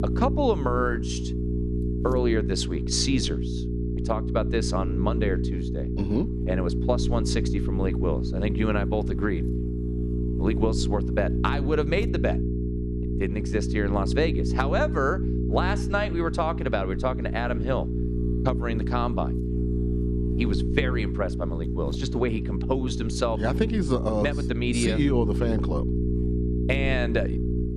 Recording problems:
electrical hum; loud; throughout; 60 Hz, 7 dB below the speech

